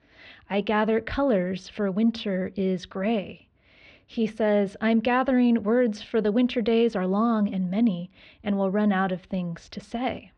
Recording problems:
muffled; slightly; fading above 3.5 kHz

